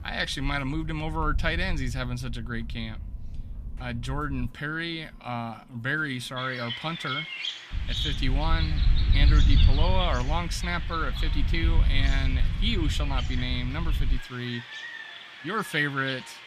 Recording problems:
animal sounds; loud; throughout; 6 dB below the speech
wind noise on the microphone; occasional gusts; until 4.5 s and from 7.5 to 14 s; 15 dB below the speech

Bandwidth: 14.5 kHz